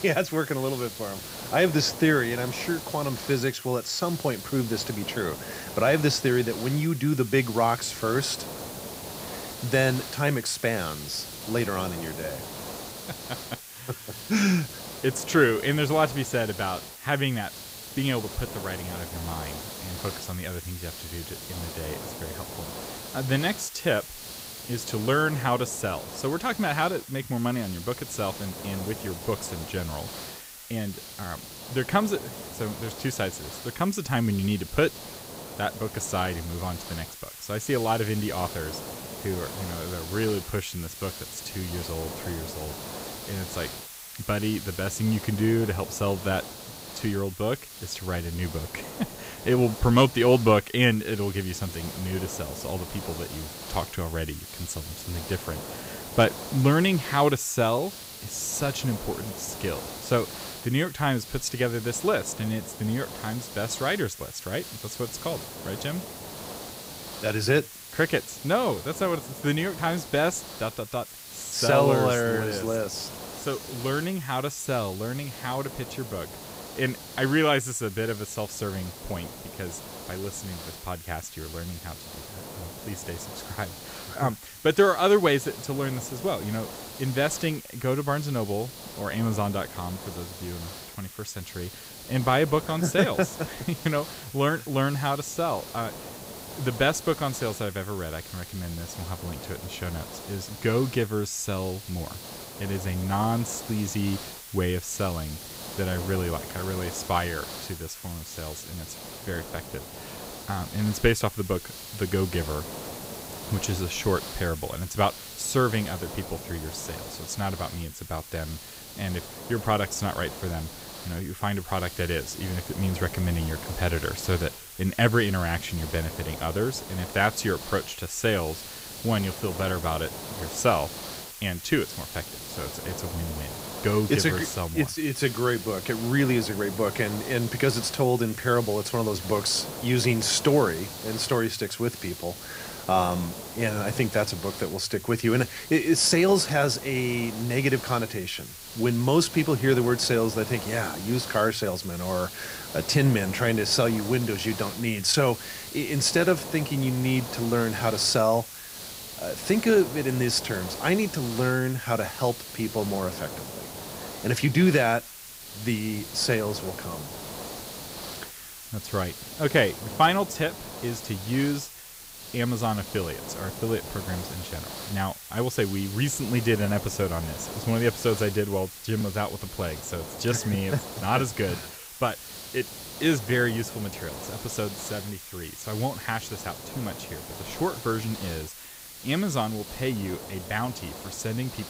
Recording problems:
hiss; noticeable; throughout; 10 dB below the speech

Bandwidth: 15.5 kHz